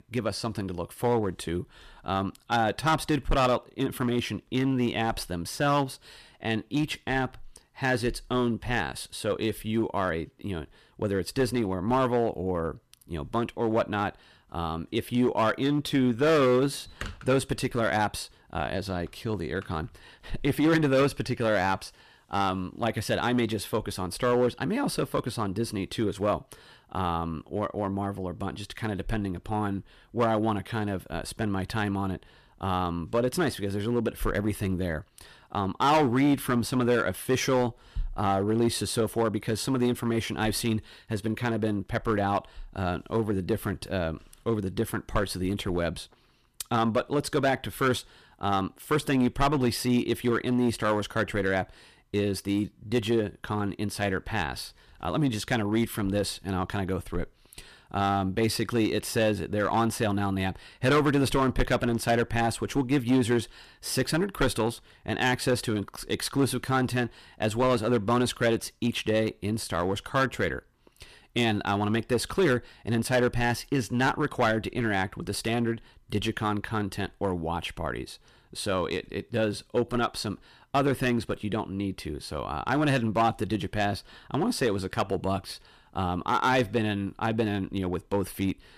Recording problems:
distortion; slight; 4% of the sound clipped

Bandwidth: 14.5 kHz